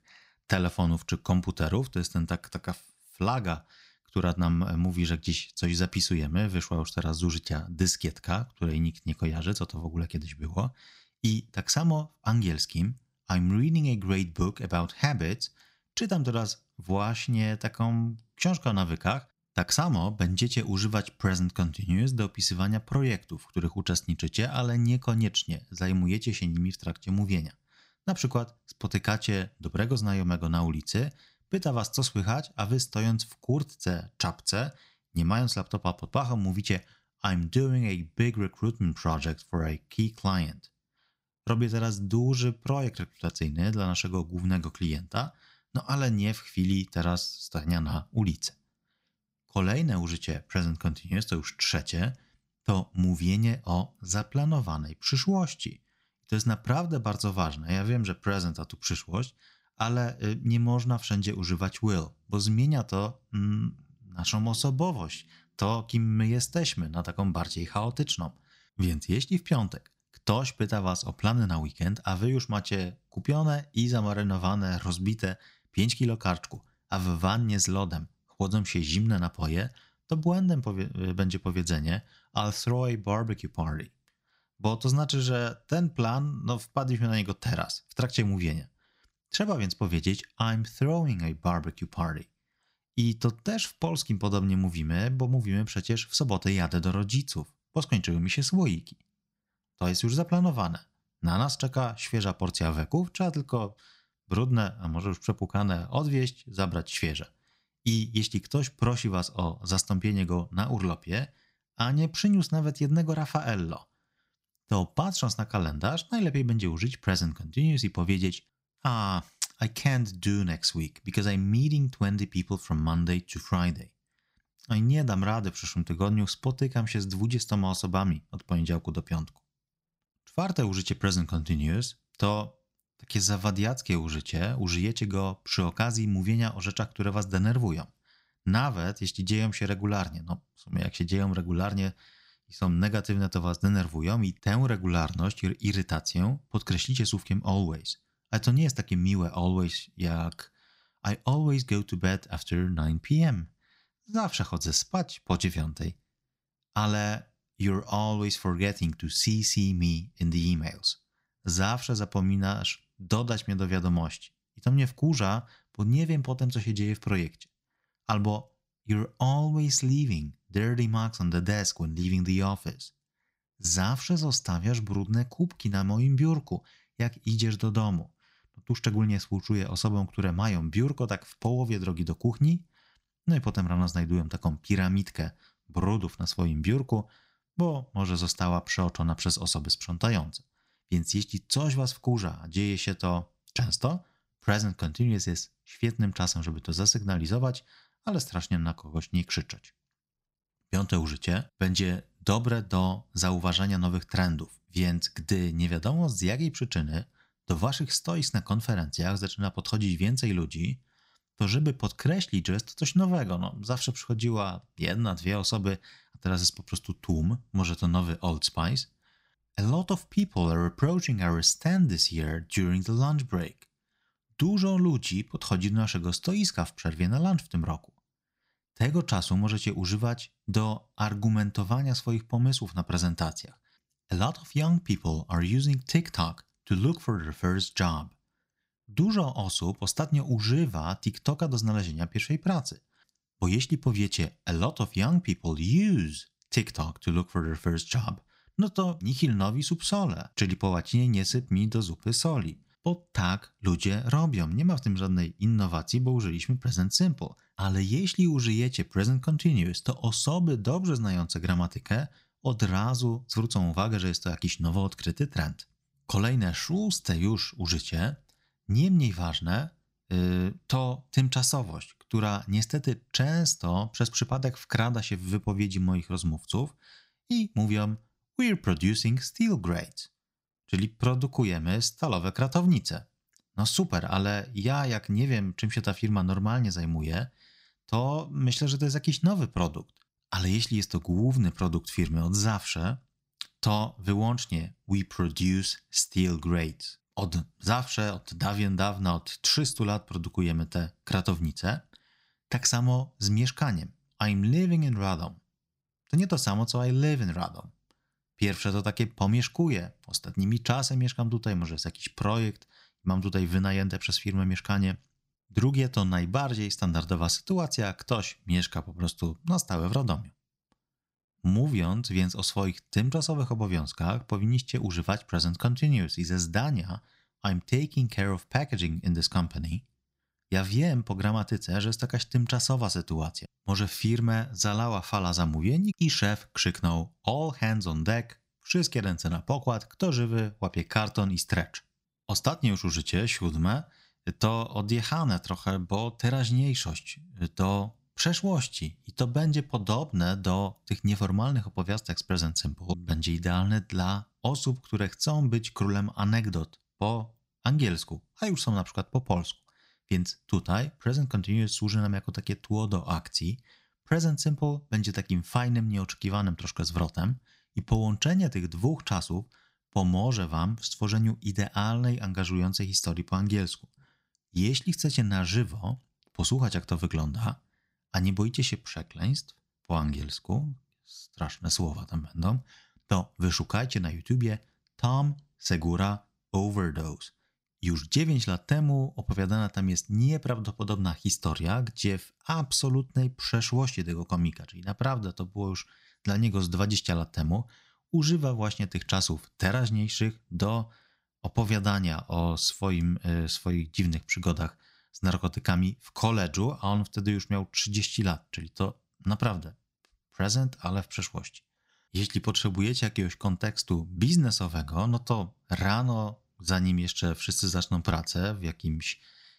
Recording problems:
none

